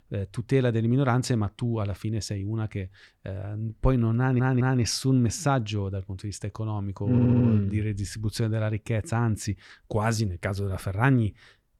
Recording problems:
audio stuttering; at 4 s and at 7 s

